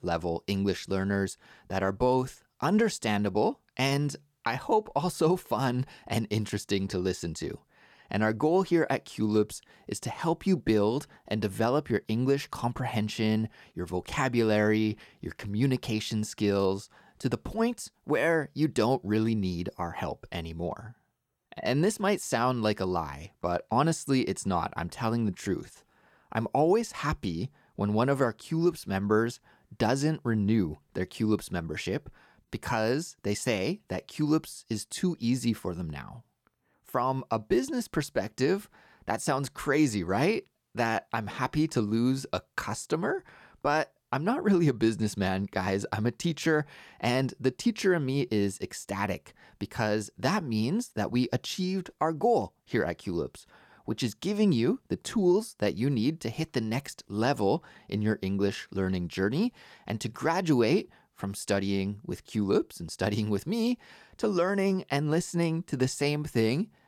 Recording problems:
none

